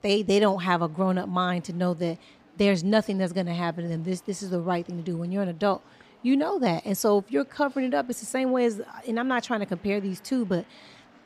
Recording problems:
murmuring crowd; faint; throughout; 30 dB below the speech

